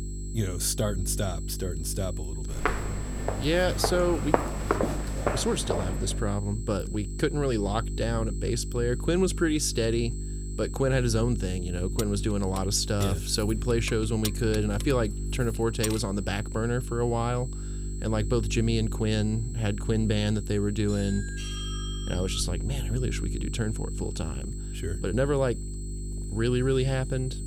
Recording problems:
electrical hum; noticeable; throughout; 50 Hz, 15 dB below the speech
high-pitched whine; noticeable; throughout; 8 kHz, 15 dB below the speech
footsteps; loud; from 2.5 to 6 s; peak 2 dB above the speech
jangling keys; noticeable; from 12 to 16 s; peak 6 dB below the speech
doorbell; noticeable; from 21 to 23 s; peak 8 dB below the speech

